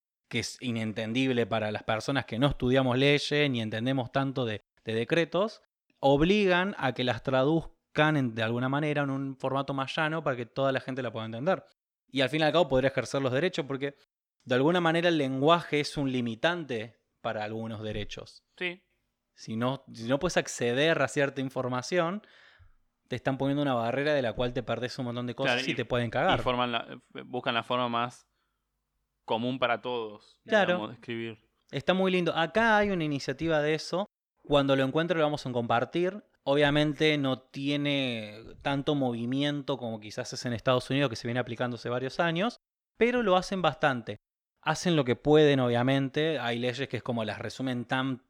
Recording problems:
none

